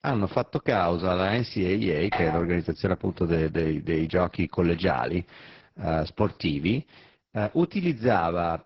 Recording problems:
garbled, watery; badly
doorbell; noticeable; at 2 s; peak 3 dB below the speech

